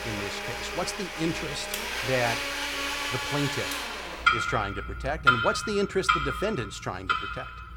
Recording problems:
household noises; very loud; throughout; 3 dB above the speech

